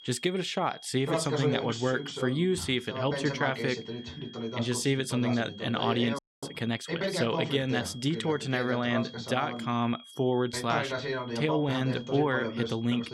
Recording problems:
voice in the background; loud; throughout; 5 dB below the speech
high-pitched whine; noticeable; throughout; 3.5 kHz, 20 dB below the speech
audio freezing; at 6 s

